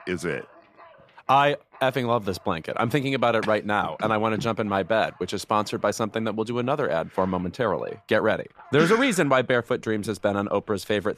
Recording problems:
animal sounds; faint; throughout; 30 dB below the speech

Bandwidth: 14.5 kHz